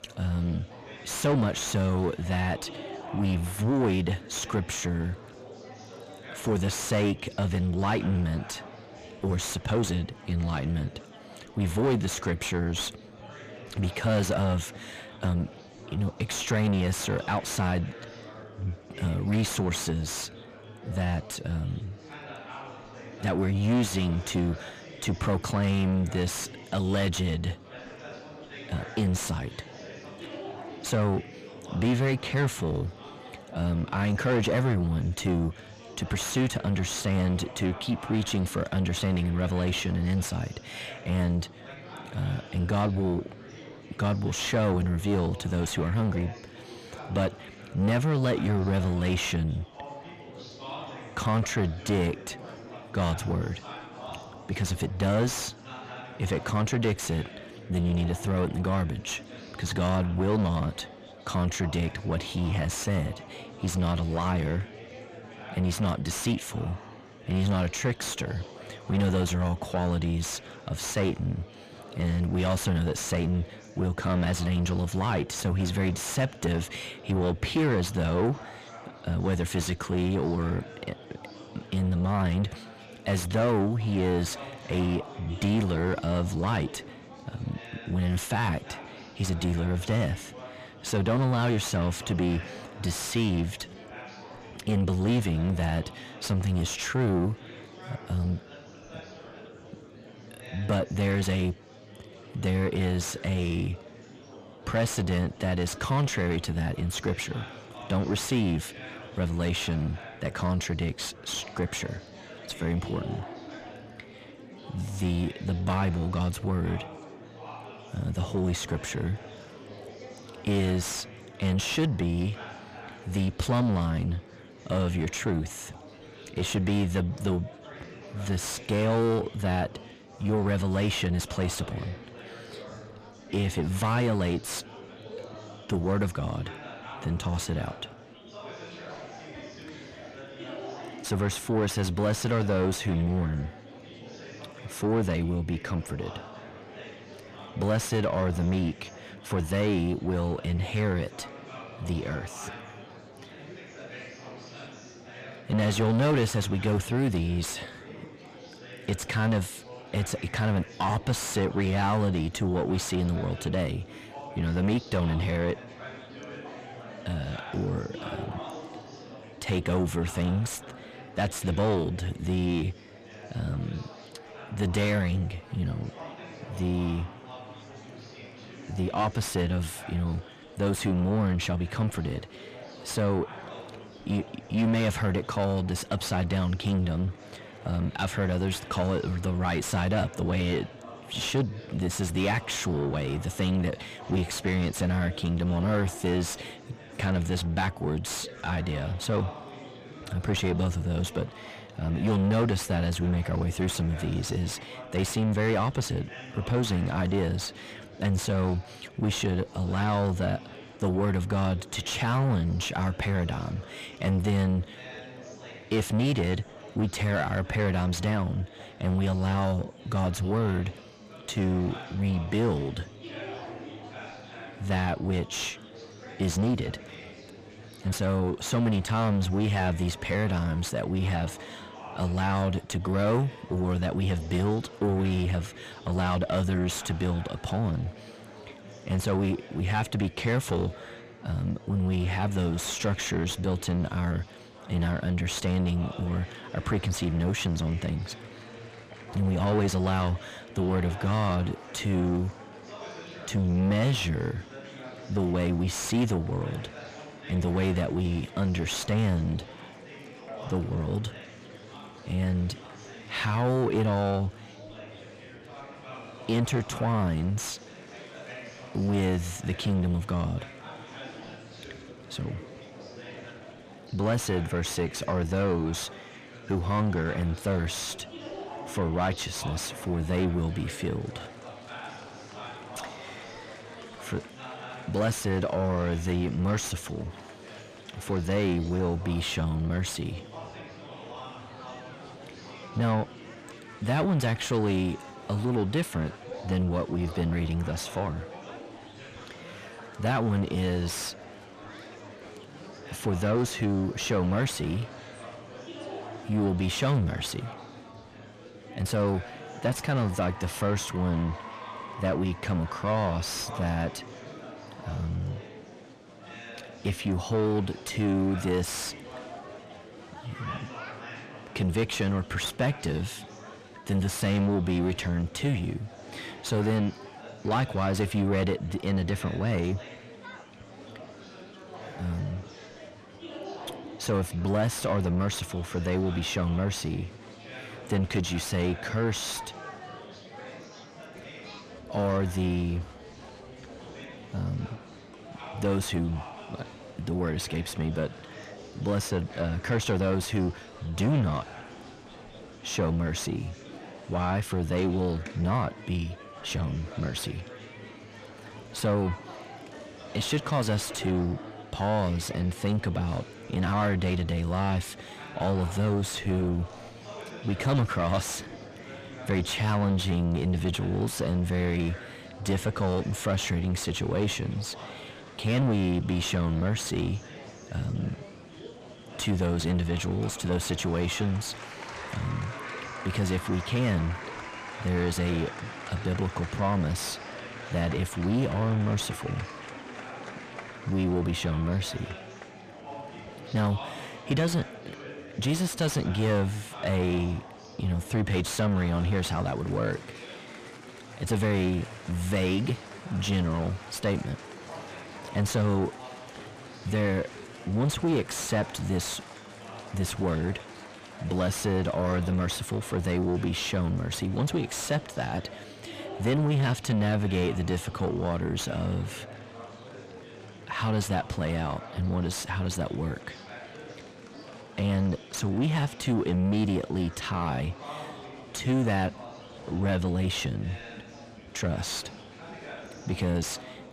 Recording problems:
distortion; heavy; 7 dB below the speech
murmuring crowd; noticeable; throughout; 15 dB below the speech

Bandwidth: 15 kHz